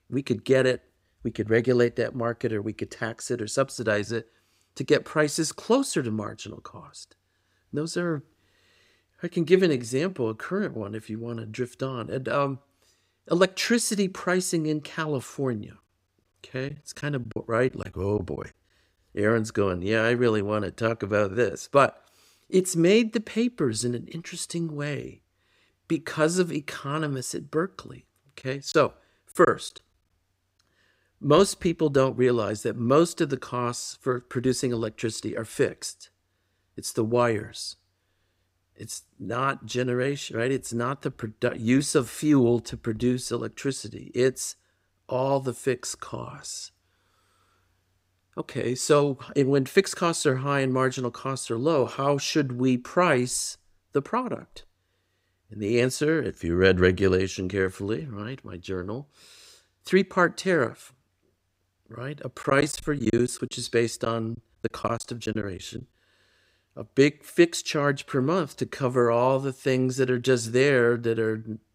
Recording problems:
choppy; very; from 17 to 18 s, at 29 s and from 1:02 to 1:06; 9% of the speech affected

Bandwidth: 15.5 kHz